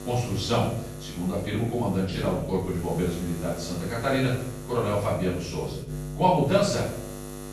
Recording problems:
off-mic speech; far
room echo; noticeable; dies away in 0.5 s
electrical hum; noticeable; throughout; 50 Hz, 15 dB below the speech

